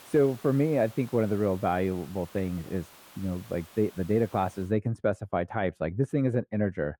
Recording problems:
muffled; very; fading above 3.5 kHz
hiss; faint; until 4.5 s; 20 dB below the speech

